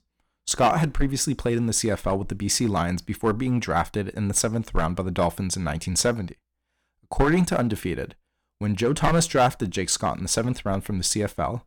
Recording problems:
distortion; slight; 3% of the sound clipped

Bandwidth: 17.5 kHz